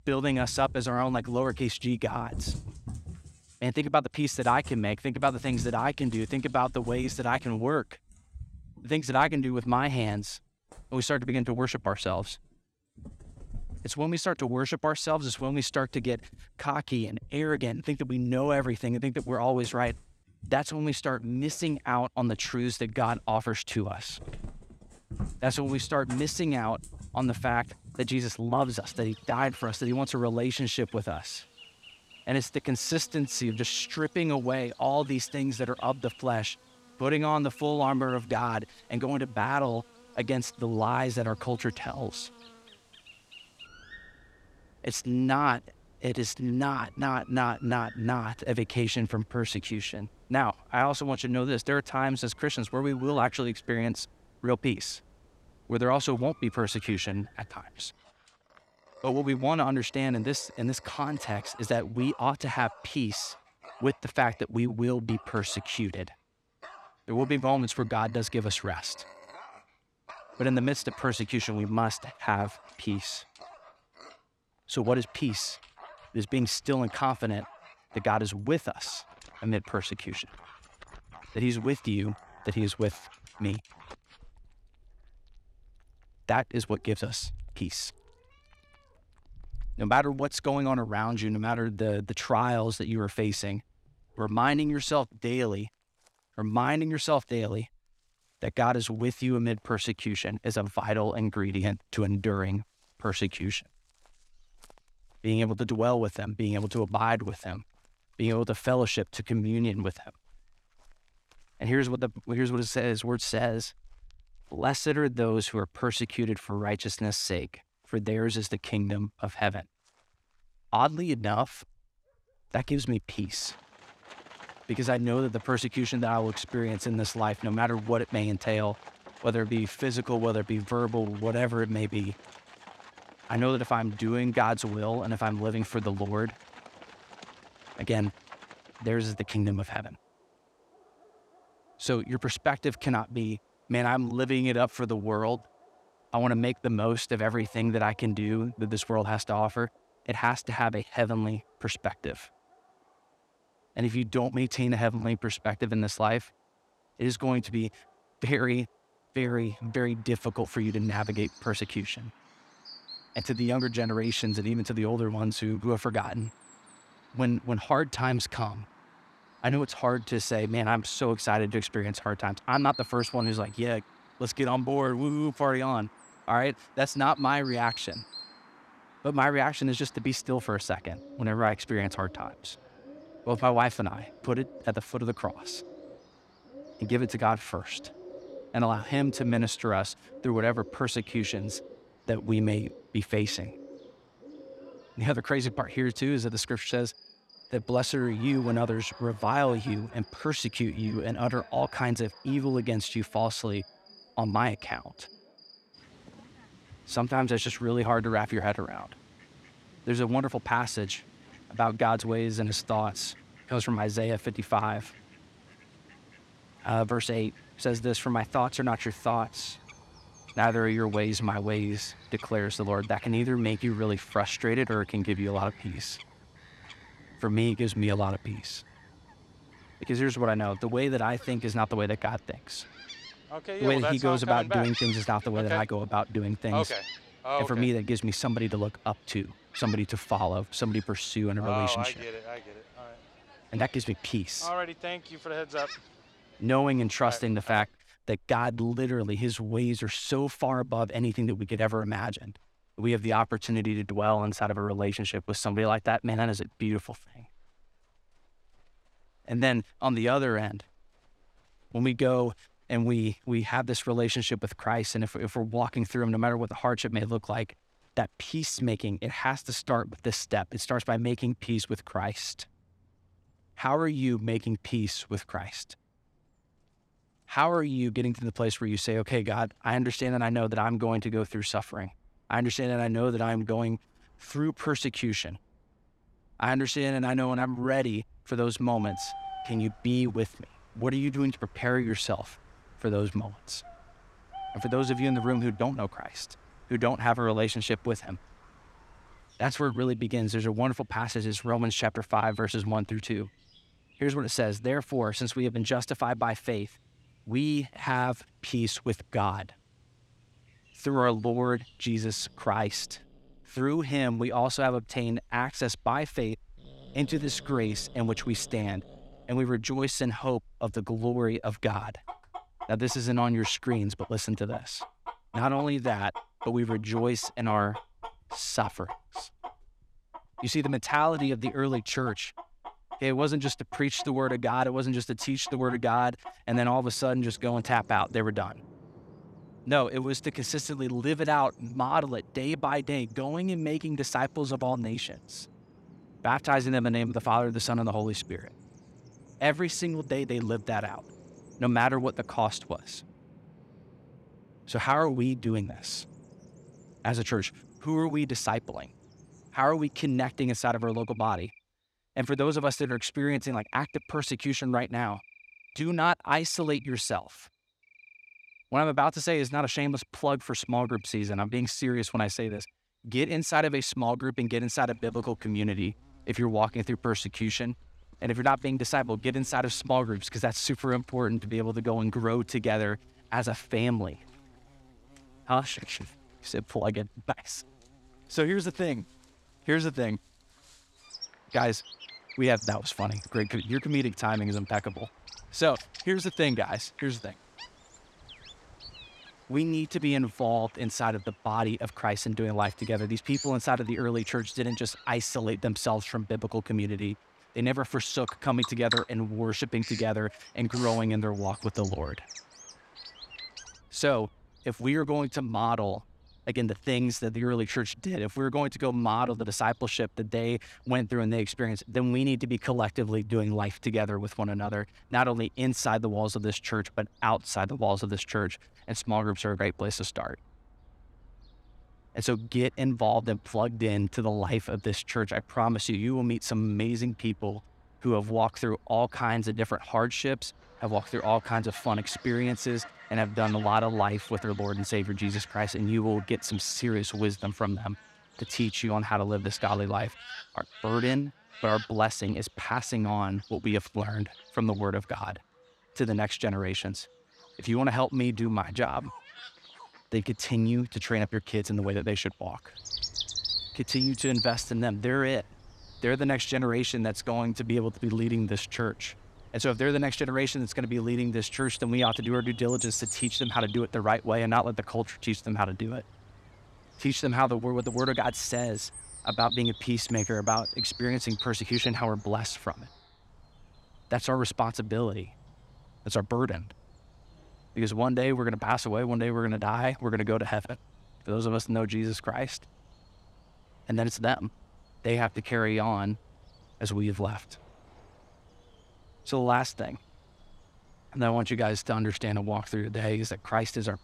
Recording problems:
animal sounds; noticeable; throughout; 15 dB below the speech

